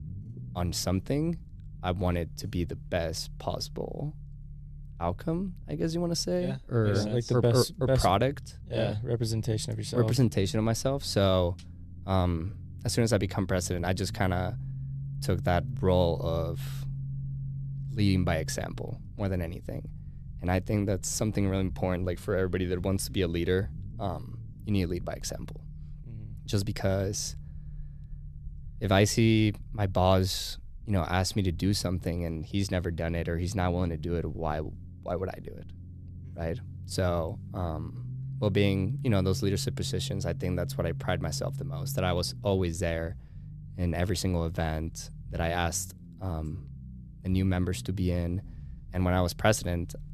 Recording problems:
low rumble; faint; throughout; 20 dB below the speech

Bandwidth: 14 kHz